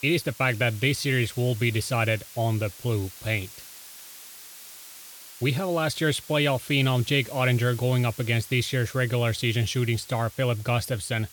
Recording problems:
hiss; noticeable; throughout; 15 dB below the speech

